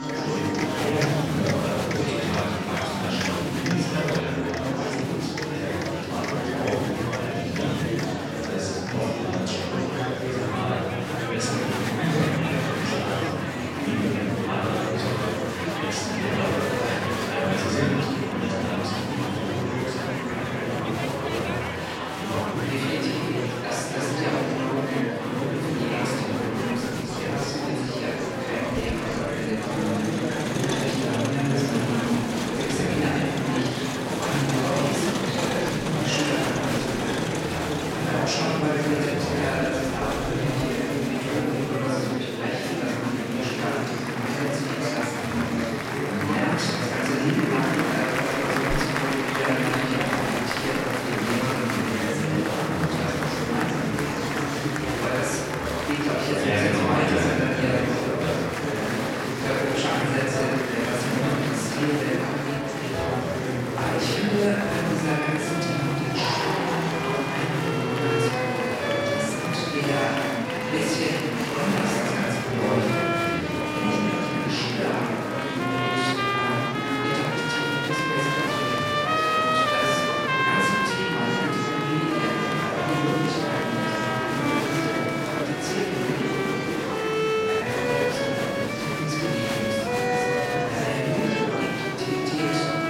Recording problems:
room echo; strong; dies away in 1.8 s
off-mic speech; far
murmuring crowd; very loud; throughout; 1 dB above the speech
background music; loud; throughout; 2 dB below the speech

